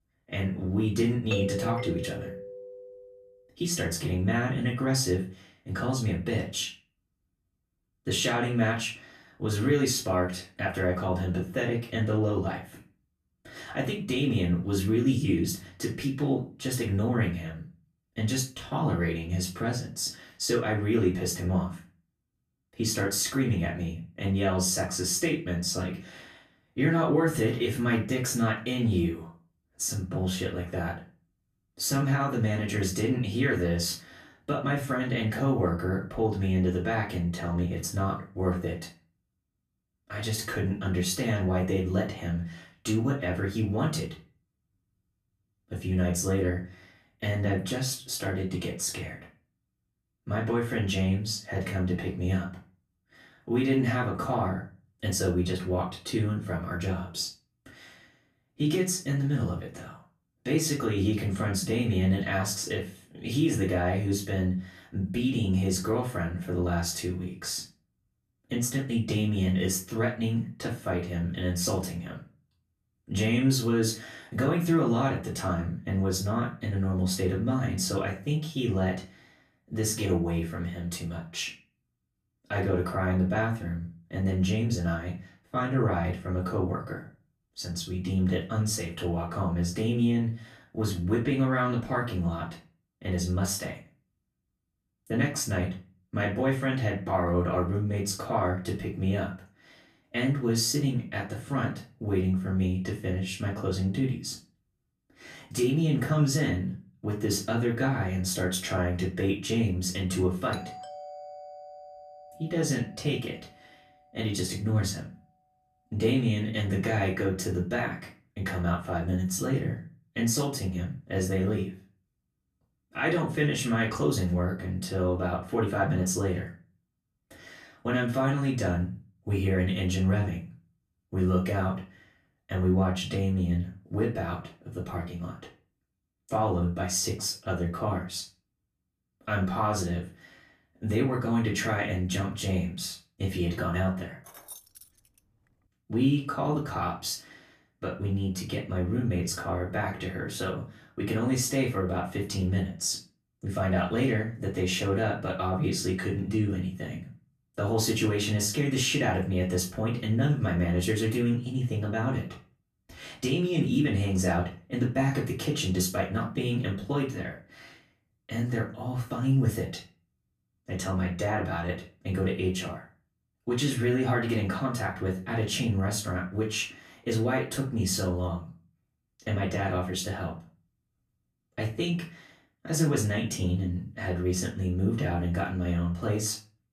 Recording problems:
off-mic speech; far
room echo; slight; dies away in 0.3 s
doorbell; noticeable; from 1.5 to 3 s; peak 3 dB below the speech
doorbell; faint; from 1:51 to 1:53; peak 15 dB below the speech
jangling keys; faint; at 2:24; peak 15 dB below the speech

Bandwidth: 14.5 kHz